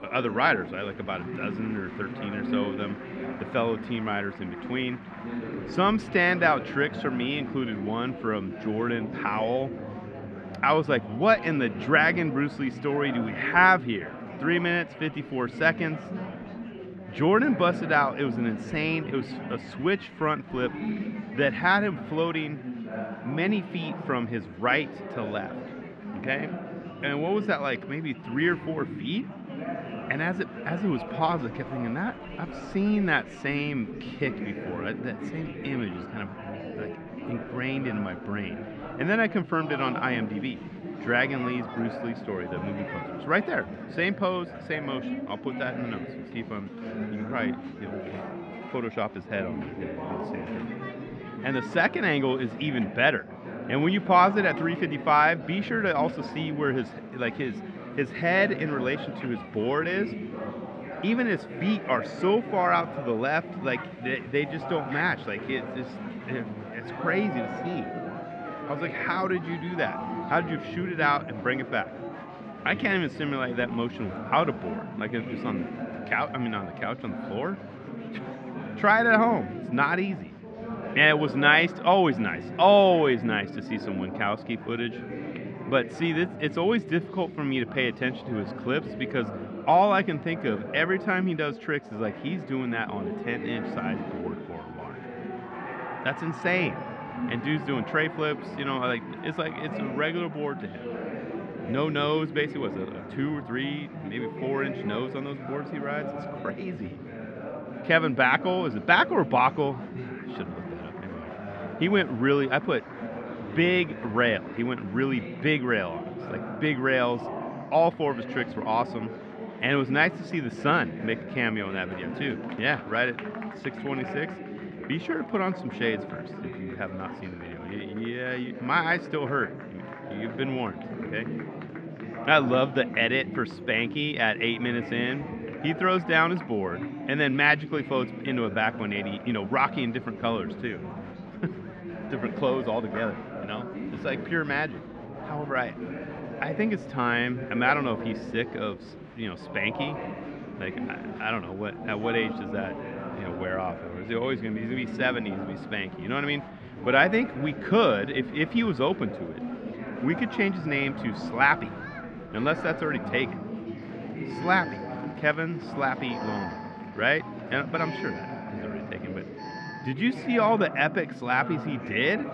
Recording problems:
muffled; very; fading above 2 kHz
chatter from many people; loud; throughout; 10 dB below the speech
alarm; faint; from 2:42 to 2:50; peak 10 dB below the speech

